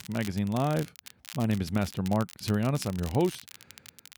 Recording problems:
crackle, like an old record; noticeable; 15 dB below the speech

